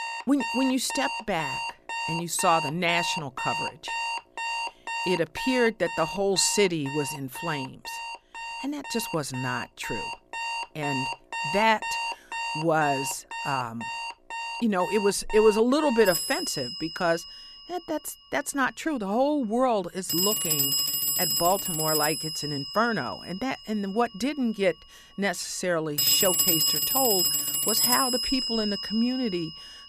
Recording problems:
alarms or sirens; loud; throughout; 1 dB below the speech

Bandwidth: 14.5 kHz